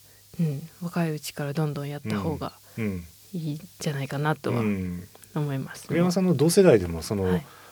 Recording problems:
hiss; faint; throughout; 25 dB below the speech

